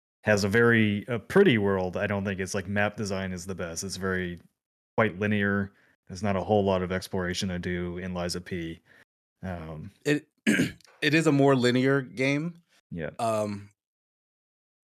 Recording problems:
none

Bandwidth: 14.5 kHz